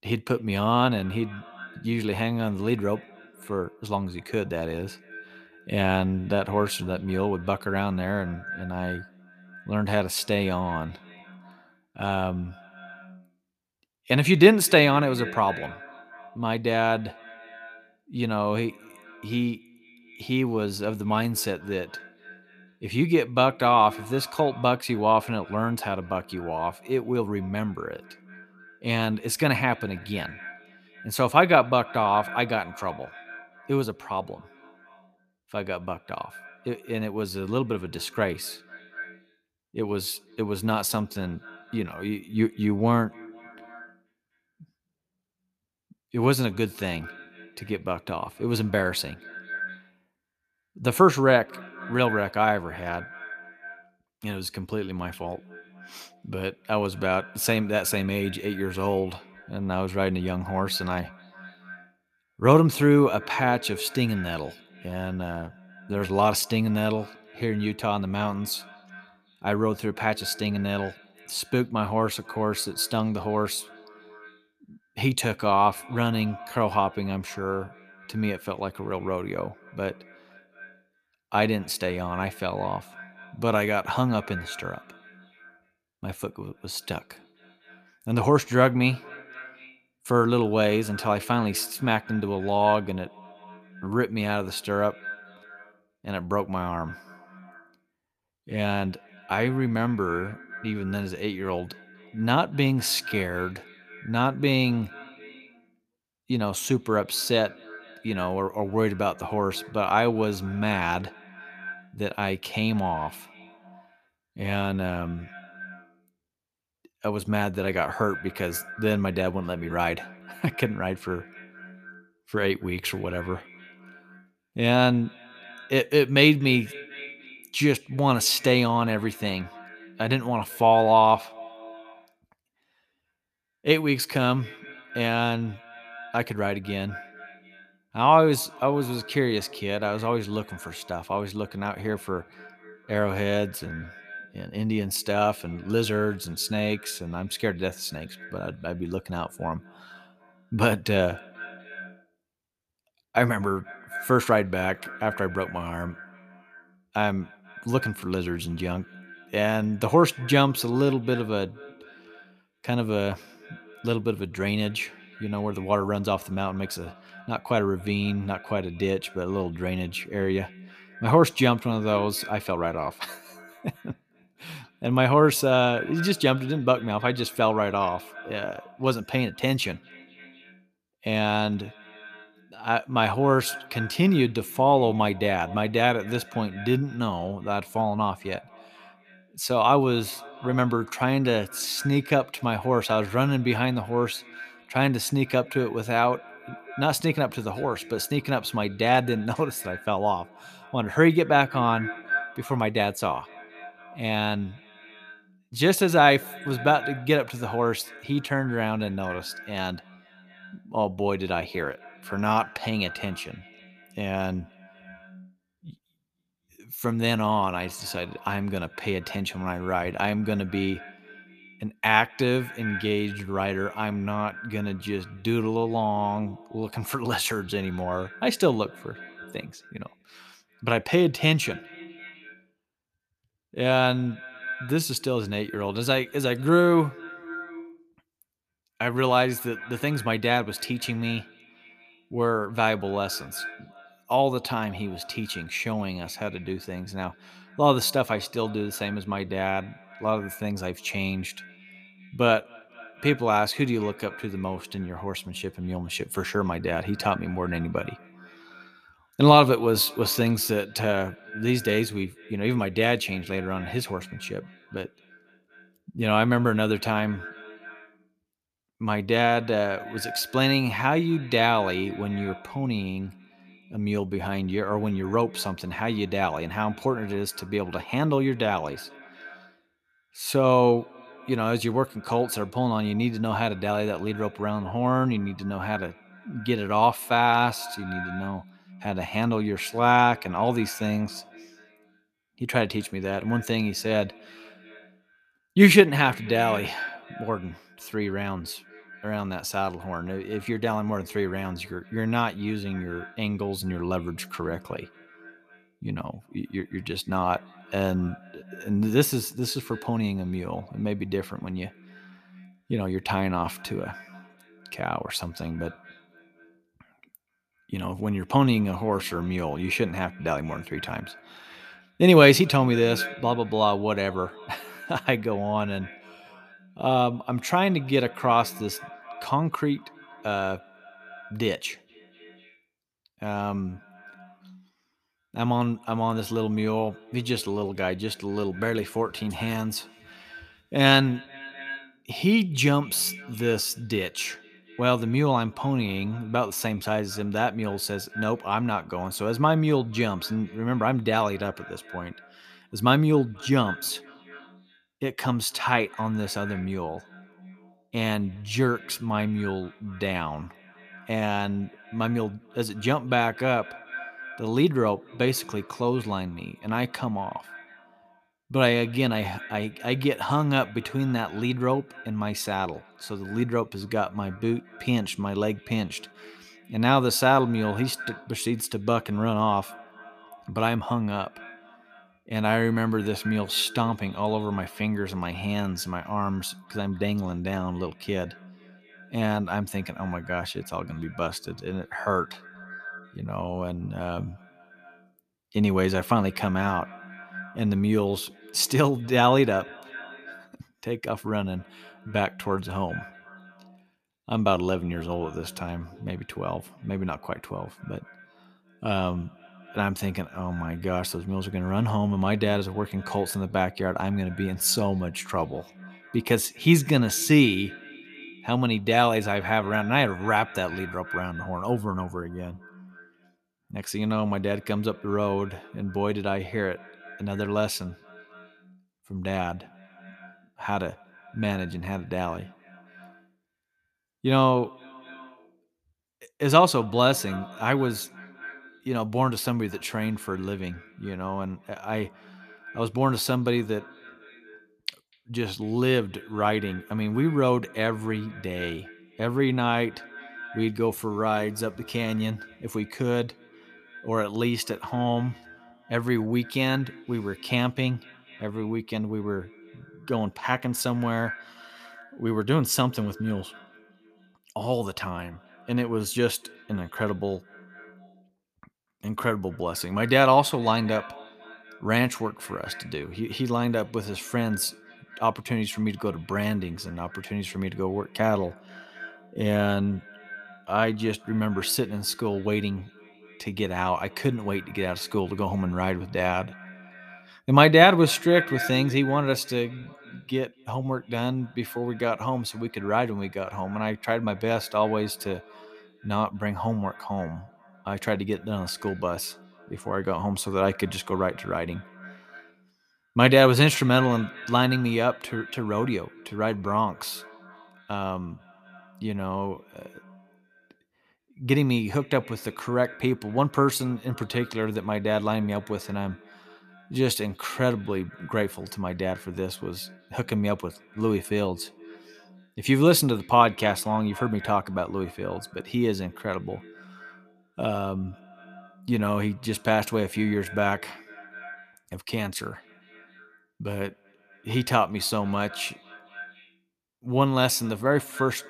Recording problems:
echo of what is said; faint; throughout; 240 ms later, 20 dB below the speech

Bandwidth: 14.5 kHz